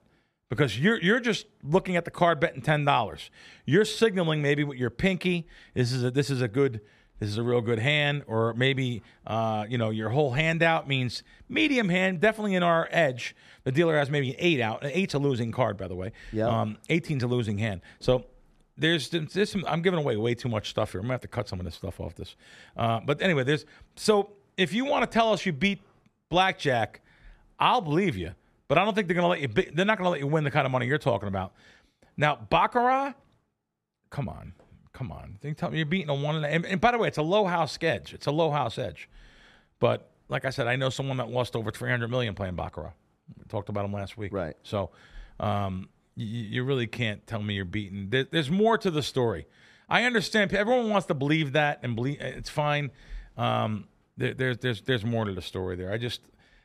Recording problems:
none

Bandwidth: 14.5 kHz